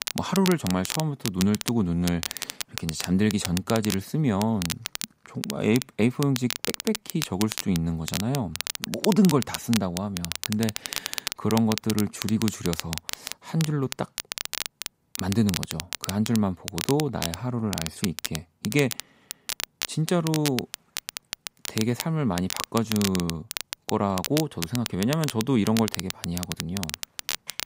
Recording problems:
crackle, like an old record; loud; 6 dB below the speech

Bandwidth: 15.5 kHz